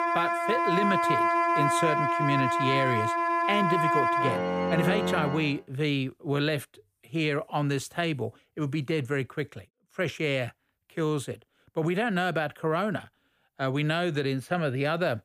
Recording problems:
background music; very loud; until 5.5 s; 3 dB above the speech

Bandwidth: 15 kHz